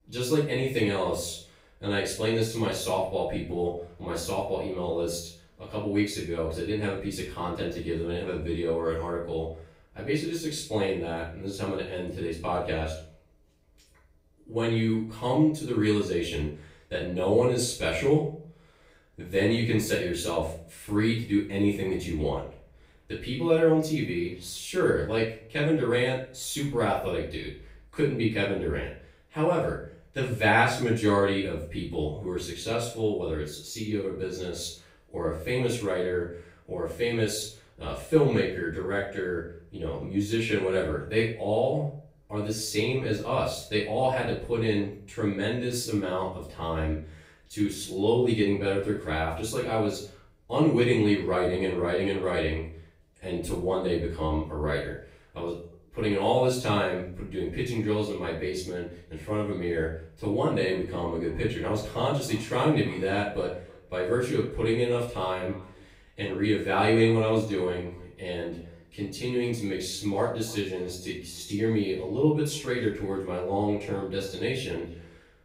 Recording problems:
off-mic speech; far
room echo; noticeable; dies away in 0.4 s
echo of what is said; faint; from 1:00 on; 300 ms later, 20 dB below the speech

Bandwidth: 15.5 kHz